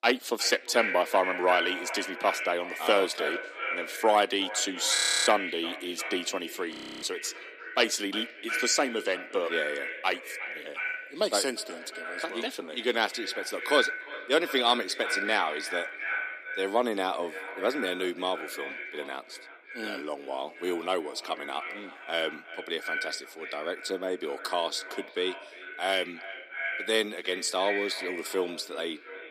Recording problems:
echo of what is said; strong; throughout; 350 ms later, 6 dB below the speech
thin; somewhat; fading below 300 Hz
audio freezing; at 5 s and at 6.5 s

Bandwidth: 15 kHz